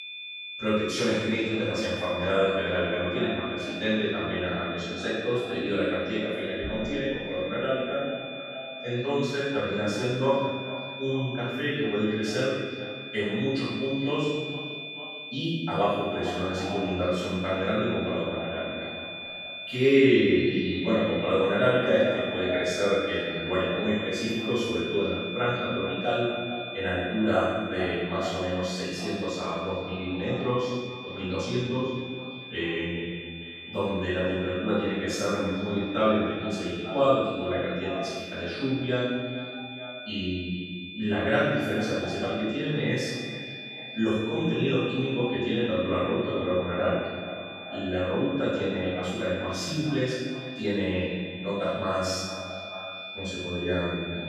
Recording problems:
room echo; strong; dies away in 1.5 s
off-mic speech; far
echo of what is said; noticeable; throughout; 440 ms later, 15 dB below the speech
high-pitched whine; loud; throughout; 2.5 kHz, 10 dB below the speech

